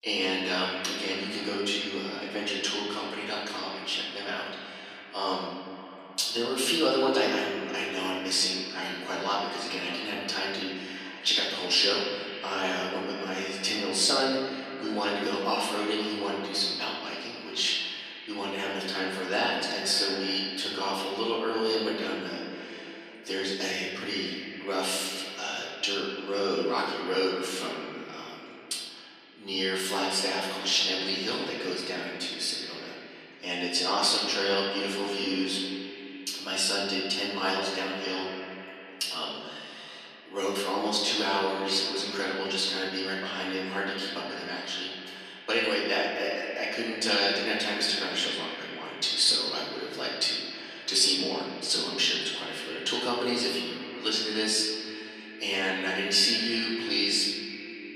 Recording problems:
off-mic speech; far
echo of what is said; noticeable; throughout; 260 ms later, 10 dB below the speech
room echo; noticeable; dies away in 1.4 s
thin; somewhat; fading below 300 Hz

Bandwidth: 14 kHz